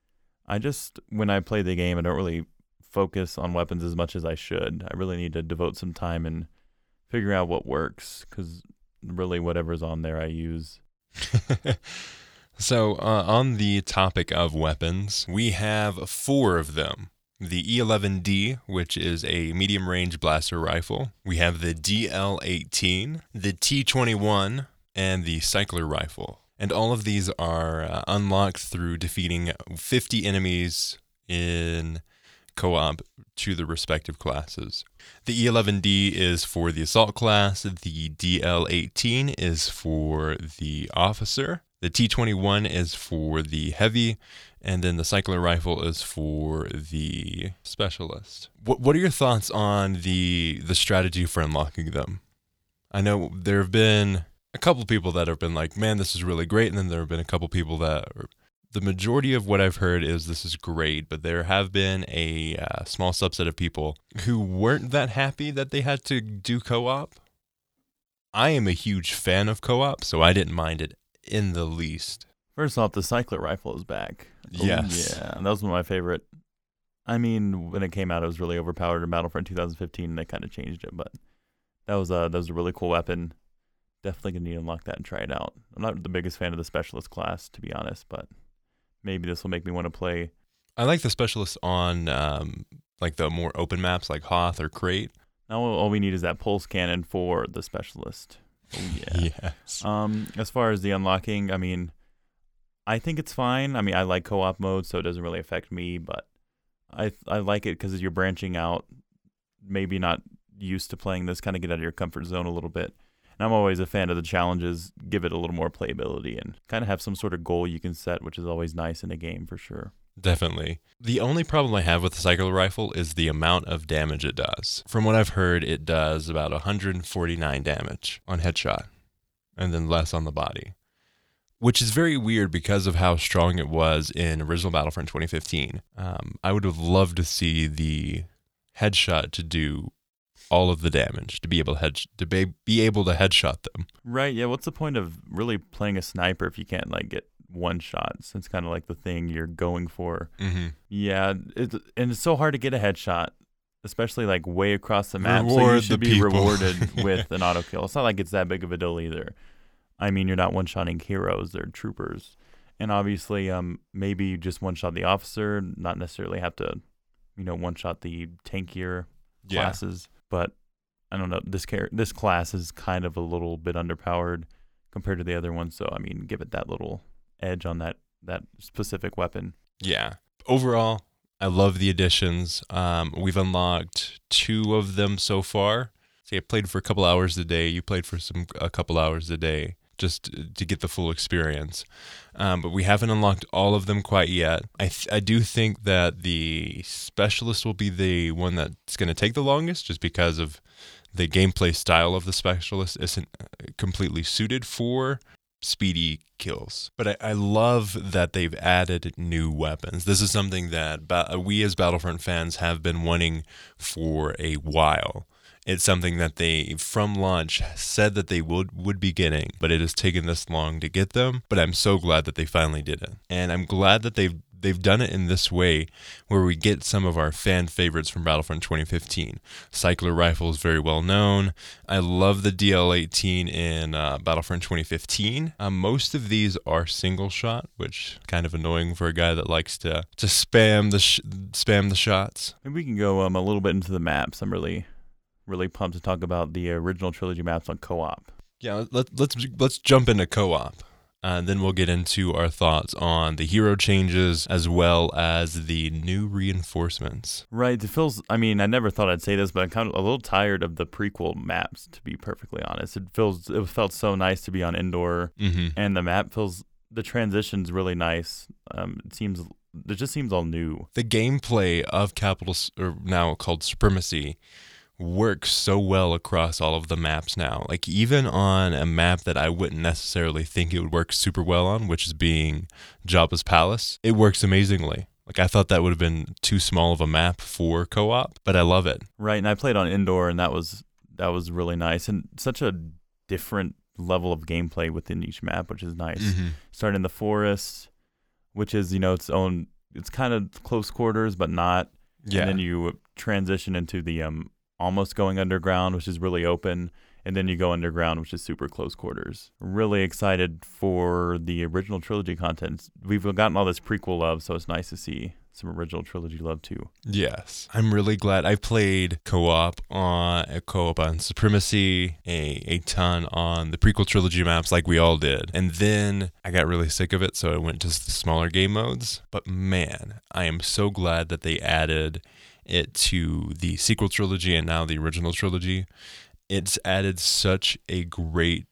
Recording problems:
none

